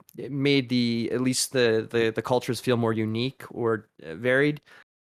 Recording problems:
none

